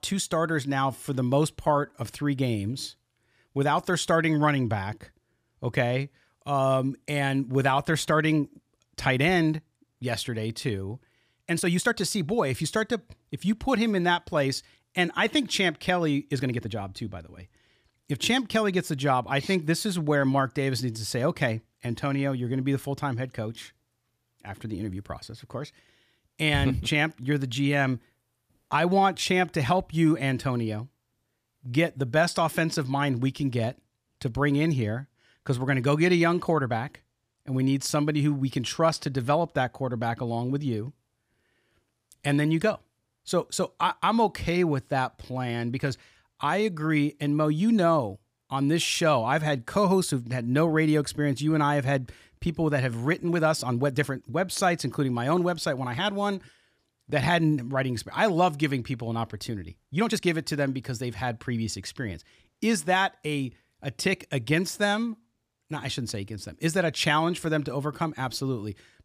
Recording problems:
uneven, jittery; strongly; from 1 s to 1:00

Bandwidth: 15 kHz